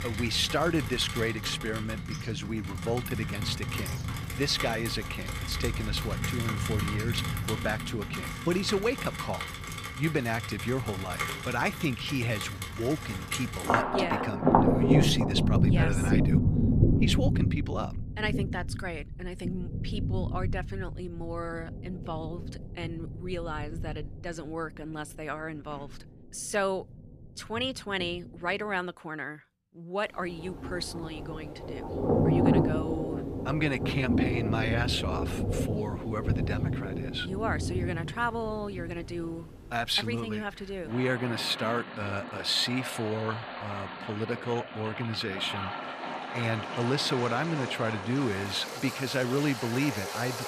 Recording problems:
rain or running water; very loud; throughout; 1 dB above the speech

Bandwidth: 14.5 kHz